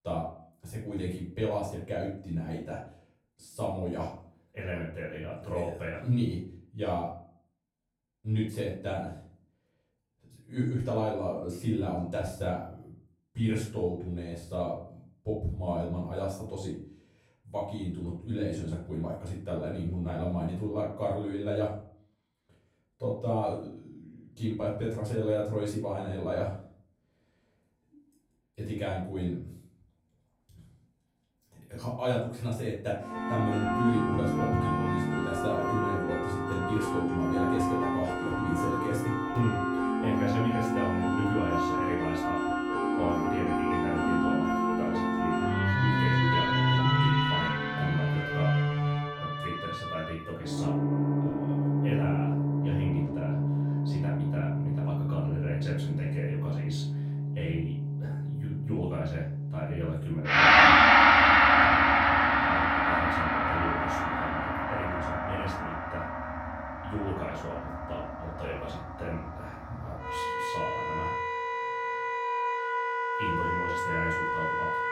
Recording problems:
off-mic speech; far
room echo; noticeable; dies away in 0.4 s
background music; very loud; from 33 s on; 8 dB above the speech

